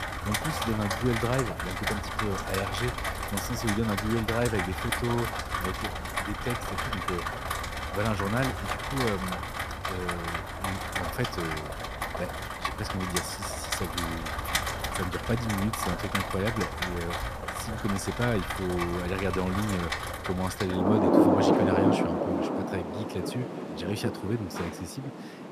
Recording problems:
rain or running water; very loud; throughout; 2 dB above the speech

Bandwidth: 14.5 kHz